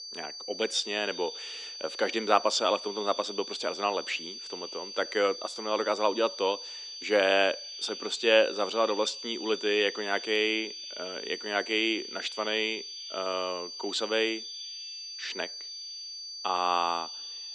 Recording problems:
thin; somewhat; fading below 300 Hz
echo of what is said; faint; throughout; 120 ms later, 20 dB below the speech
high-pitched whine; loud; throughout; 4.5 kHz, 10 dB below the speech

